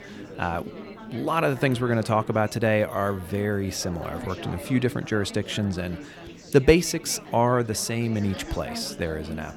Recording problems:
chatter from many people; noticeable; throughout; 15 dB below the speech

